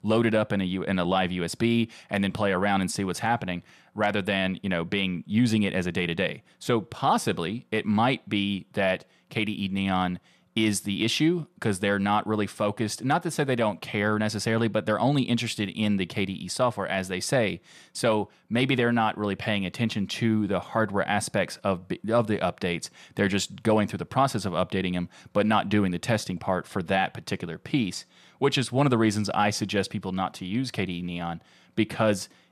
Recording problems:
none

